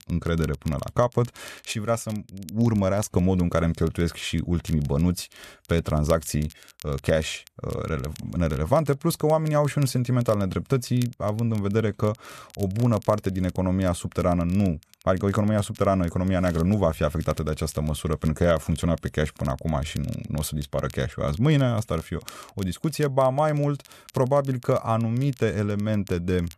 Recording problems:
crackle, like an old record; faint; 25 dB below the speech

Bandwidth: 14 kHz